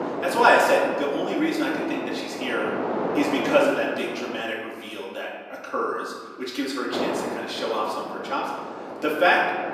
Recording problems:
off-mic speech; far
room echo; noticeable; dies away in 1.4 s
thin; very slightly; fading below 300 Hz
wind noise on the microphone; heavy; until 4.5 s and from 7 s on; 8 dB below the speech

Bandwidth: 15 kHz